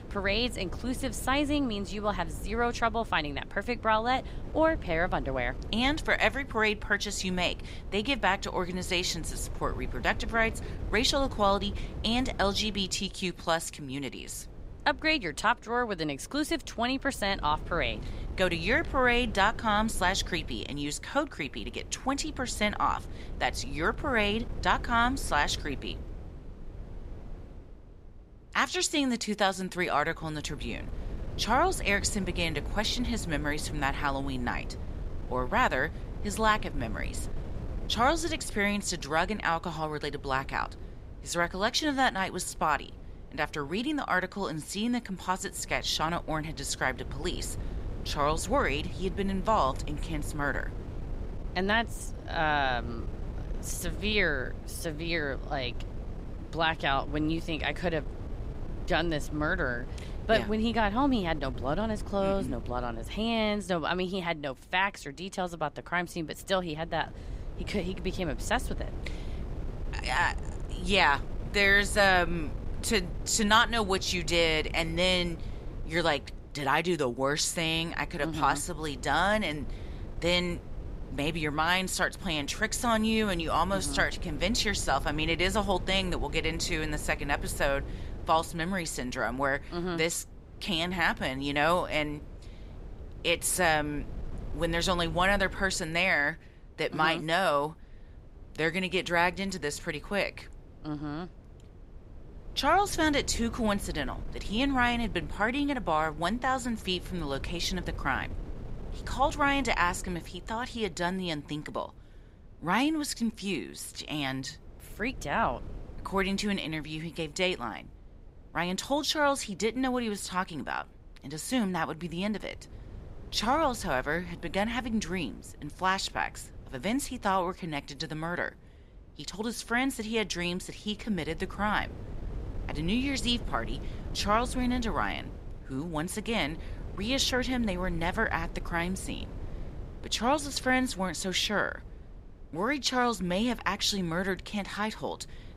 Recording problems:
wind noise on the microphone; occasional gusts; 20 dB below the speech

